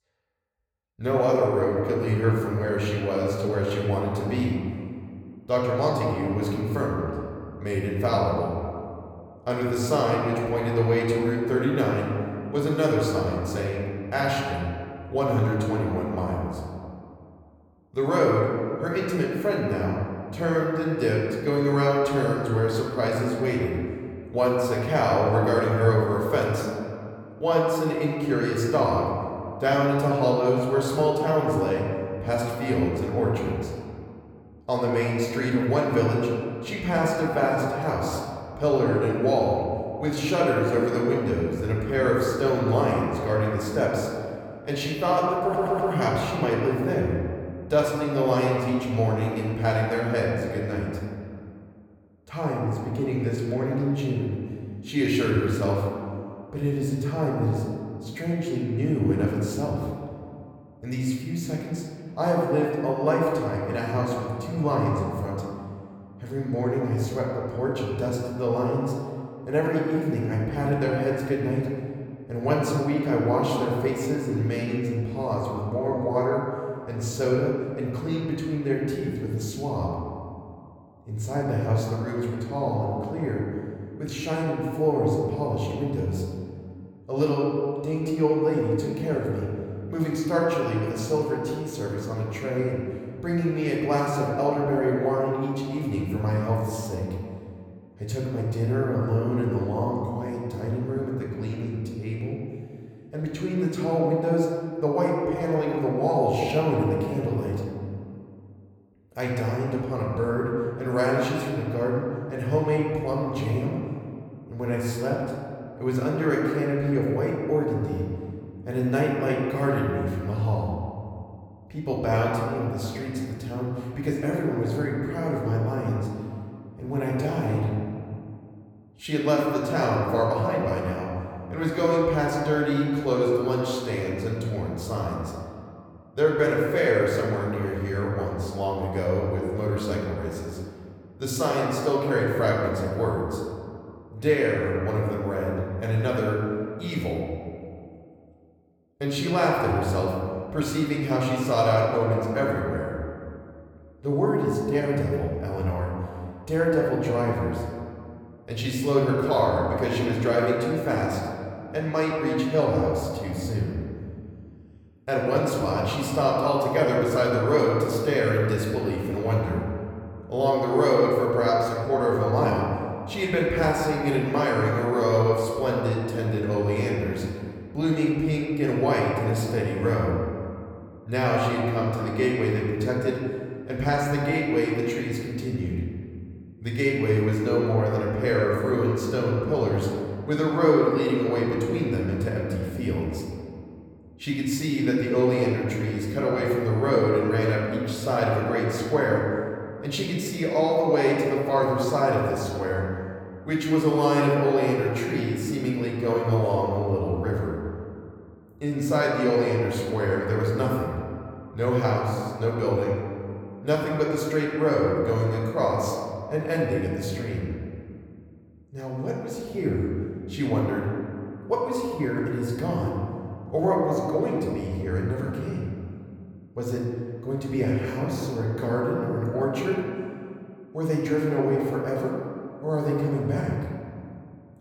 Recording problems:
room echo; noticeable; dies away in 2.1 s
off-mic speech; somewhat distant
audio stuttering; at 45 s

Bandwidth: 18.5 kHz